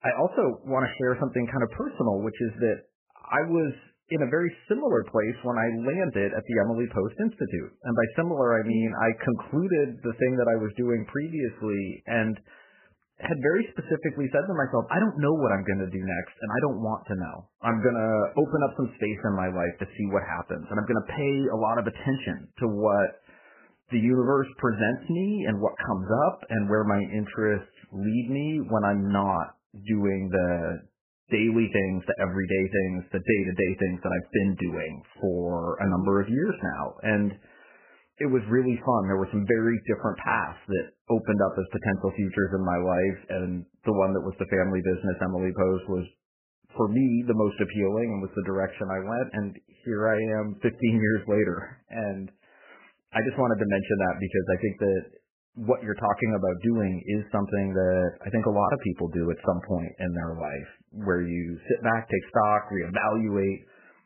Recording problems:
garbled, watery; badly; nothing above 3 kHz

